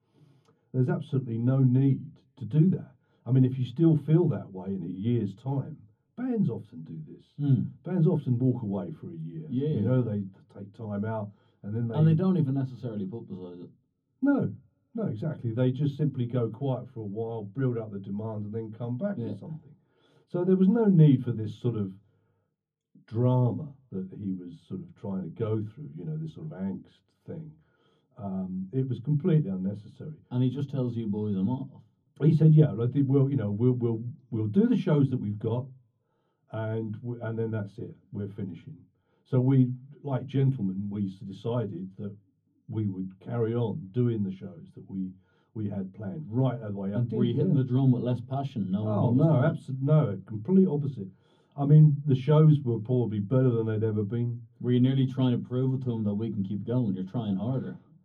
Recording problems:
off-mic speech; far
room echo; slight; dies away in 0.3 s

